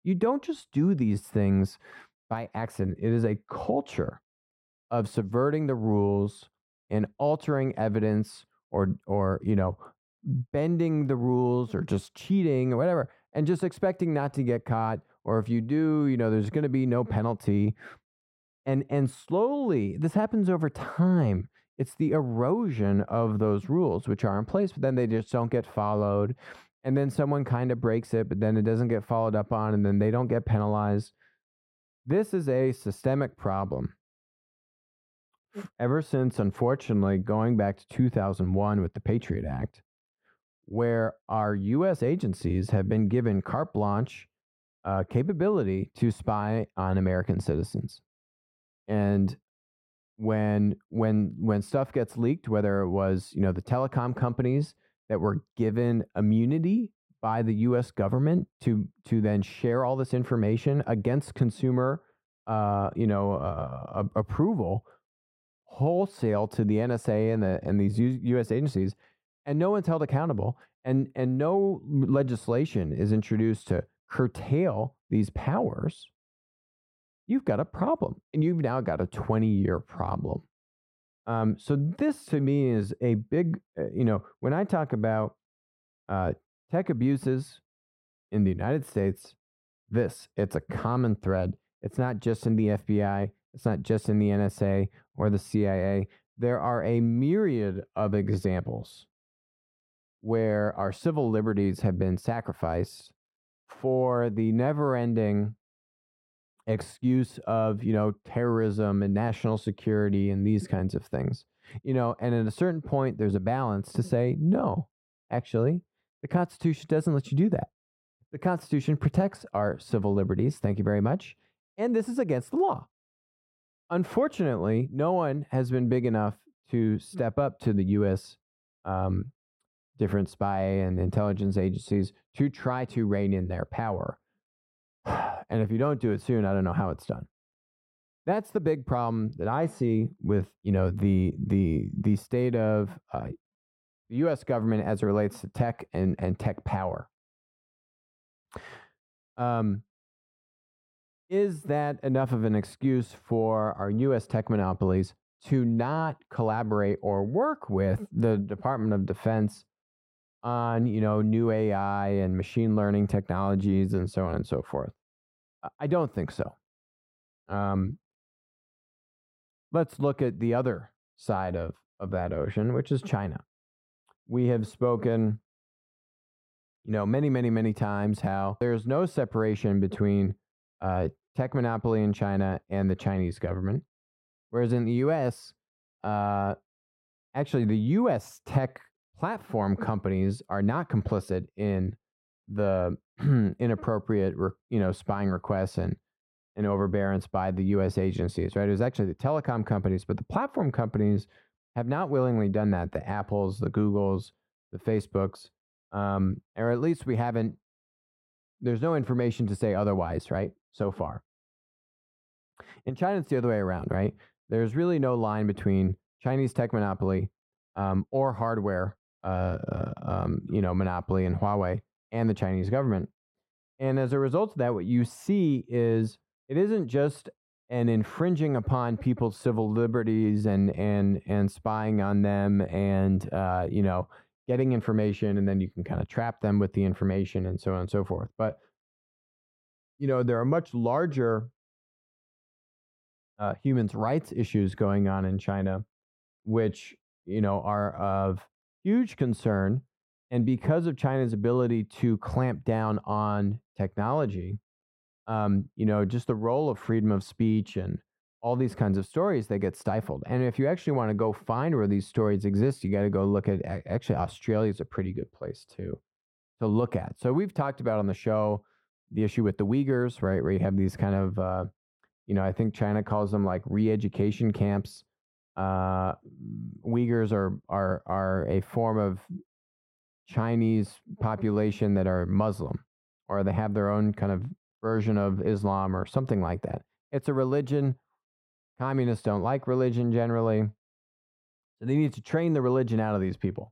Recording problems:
muffled; very; fading above 2 kHz

